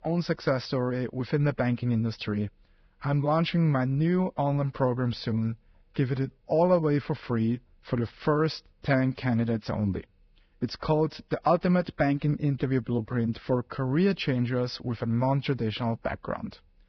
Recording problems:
garbled, watery; badly; nothing above 5.5 kHz

